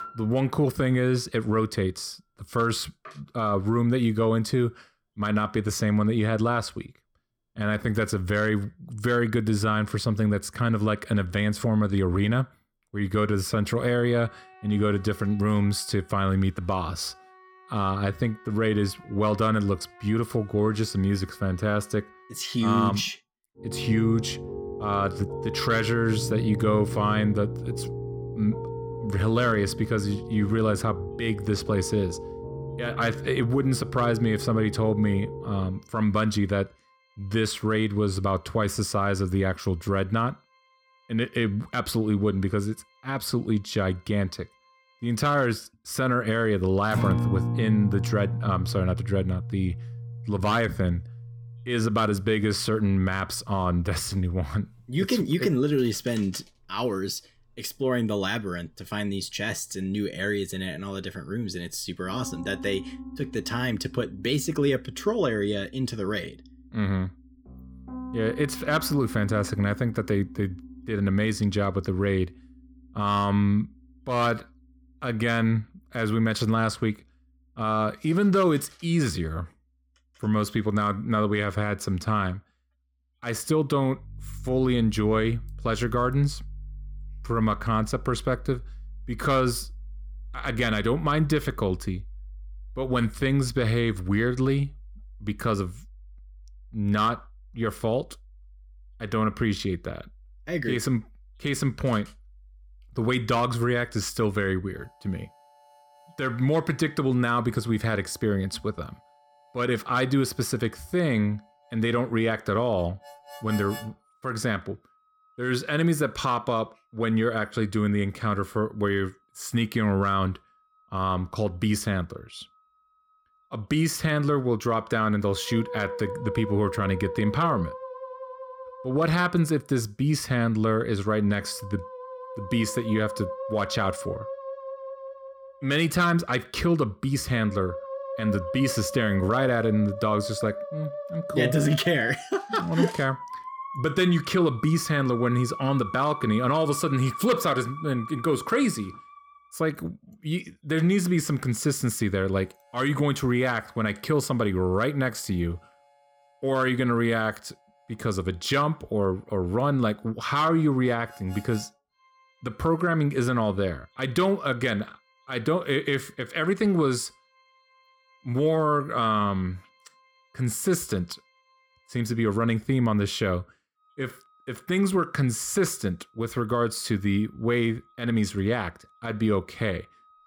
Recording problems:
background music; noticeable; throughout; 10 dB below the speech

